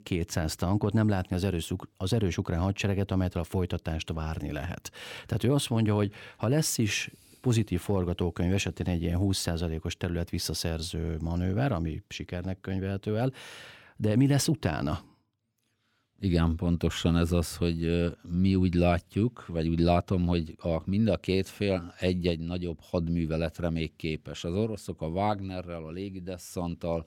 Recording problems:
none

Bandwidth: 17 kHz